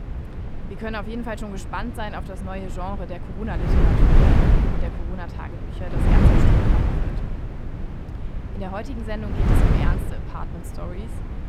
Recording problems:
wind noise on the microphone; heavy; 3 dB above the speech

